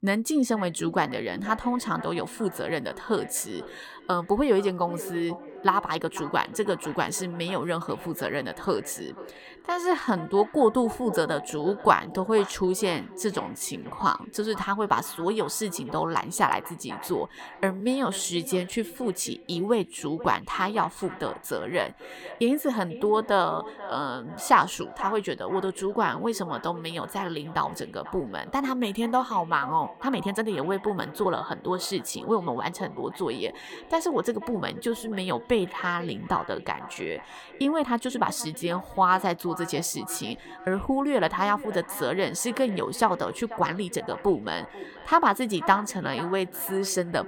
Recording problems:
echo of what is said; noticeable; throughout; 490 ms later, 15 dB below the speech
uneven, jittery; strongly; from 5.5 to 47 s

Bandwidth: 18 kHz